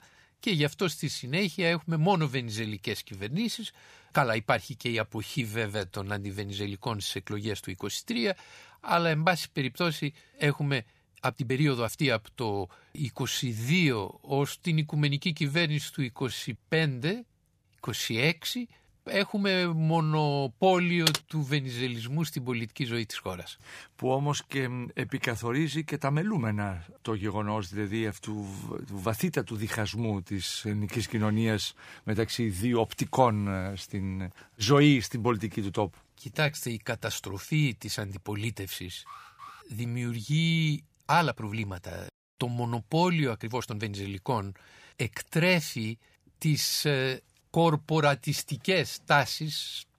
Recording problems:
uneven, jittery; strongly; from 5 to 44 s
keyboard typing; loud; at 21 s; peak 1 dB above the speech
alarm; faint; at 39 s; peak 15 dB below the speech

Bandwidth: 15 kHz